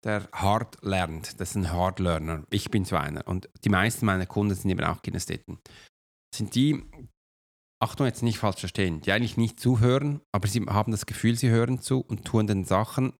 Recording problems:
none

